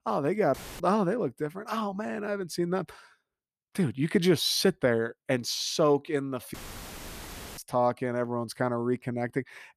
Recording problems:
audio cutting out; filled with static; at 0.5 s and at 6.5 s for 1 s

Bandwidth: 14.5 kHz